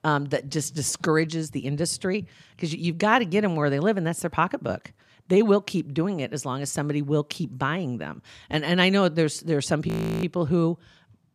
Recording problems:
audio freezing; at 10 s

